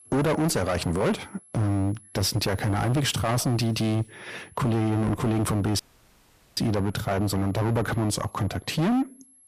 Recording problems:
distortion; heavy; 21% of the sound clipped
high-pitched whine; faint; throughout; 11 kHz, 25 dB below the speech
audio cutting out; at 6 s for 1 s

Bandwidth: 14.5 kHz